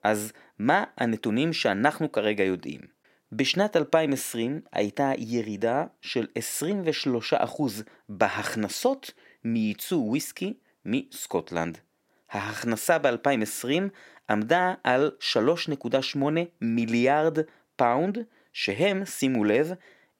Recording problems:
none

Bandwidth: 16 kHz